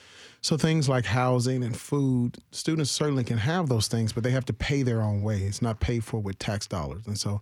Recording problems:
none

